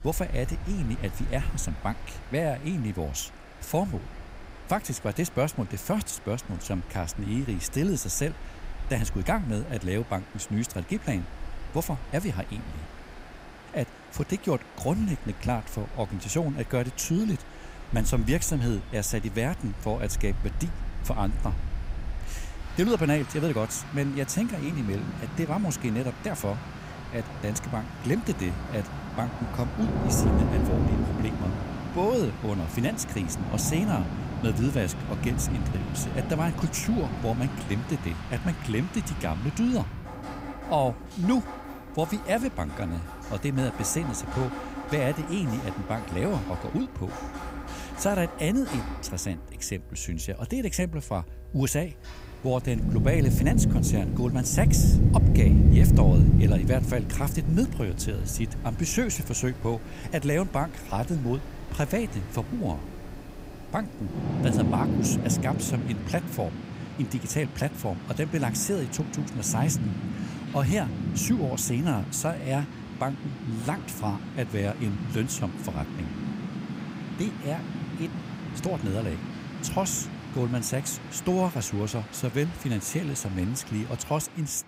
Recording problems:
rain or running water; loud; throughout; 1 dB below the speech
traffic noise; faint; throughout; 30 dB below the speech

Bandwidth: 15.5 kHz